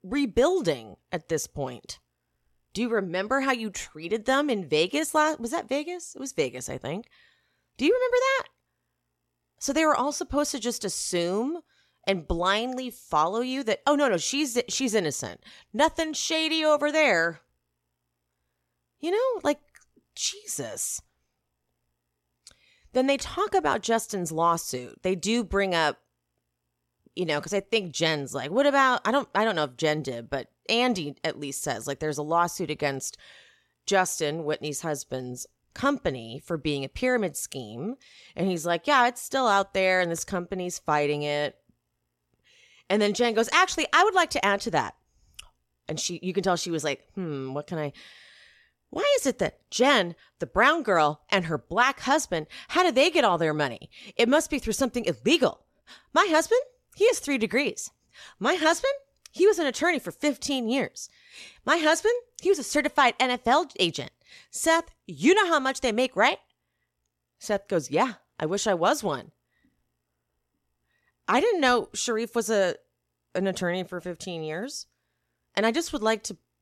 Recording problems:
none

